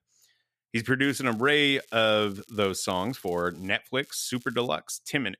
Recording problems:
crackling; faint; from 1 to 3.5 s and at 4 s; 25 dB below the speech

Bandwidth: 14.5 kHz